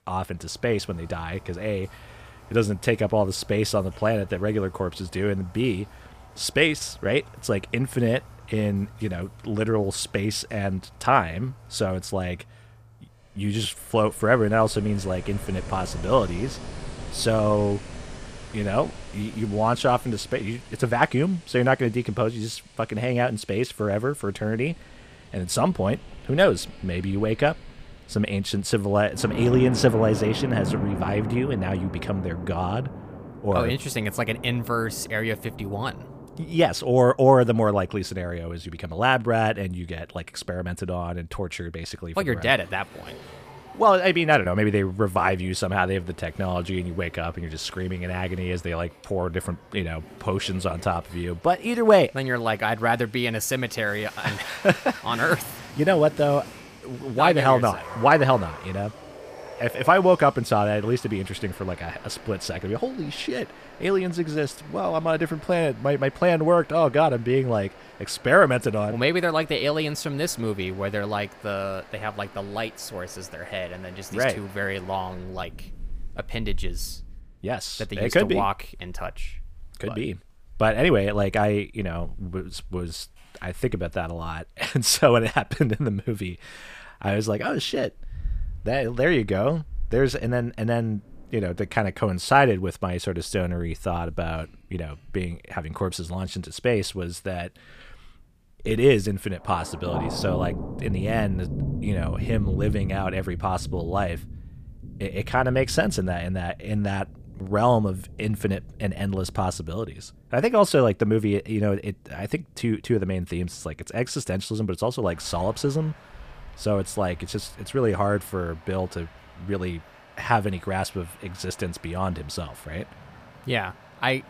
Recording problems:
rain or running water; noticeable; throughout; 15 dB below the speech

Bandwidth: 15 kHz